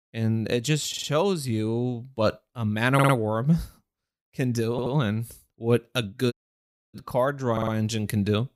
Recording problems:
audio stuttering; 4 times, first at 1 s
audio cutting out; at 6.5 s for 0.5 s

